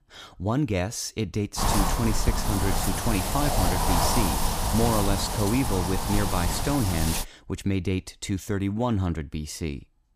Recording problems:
wind noise on the microphone; heavy; from 1.5 to 7 s; 3 dB above the speech

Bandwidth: 15 kHz